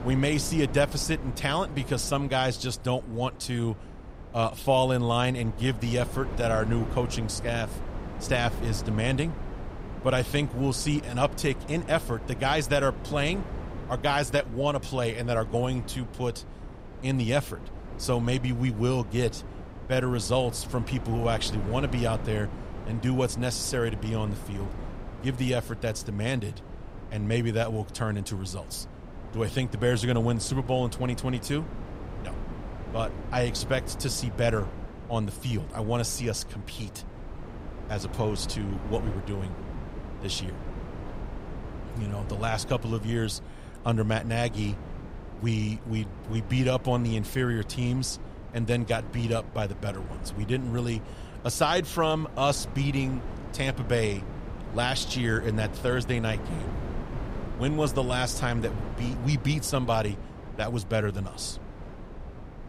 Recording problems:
wind noise on the microphone; occasional gusts; 15 dB below the speech

